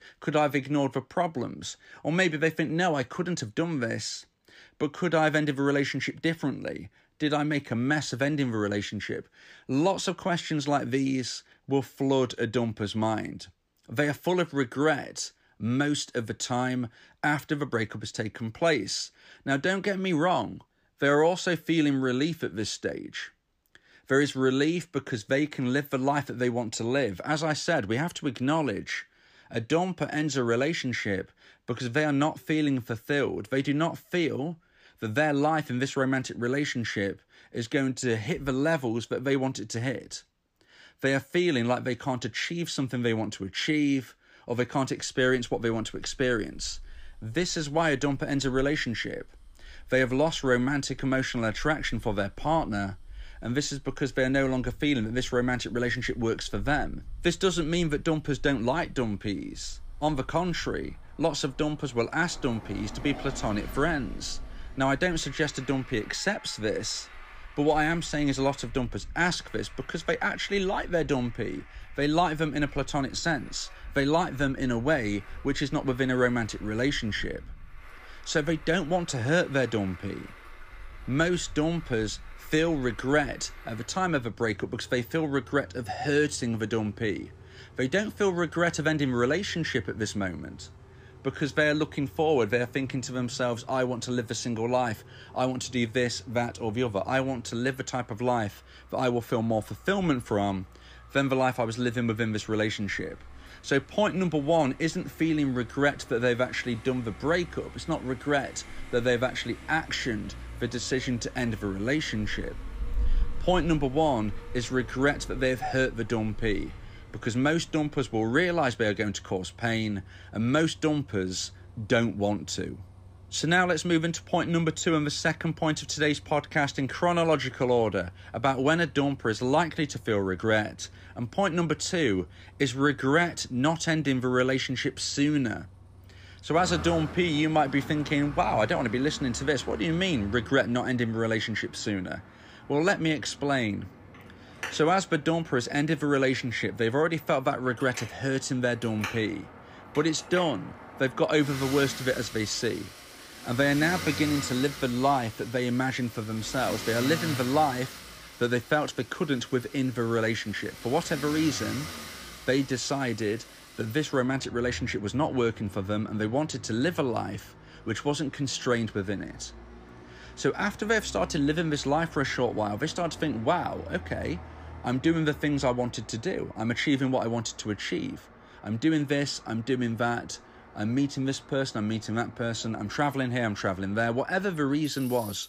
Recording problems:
traffic noise; noticeable; from 45 s on; 15 dB below the speech

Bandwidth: 15 kHz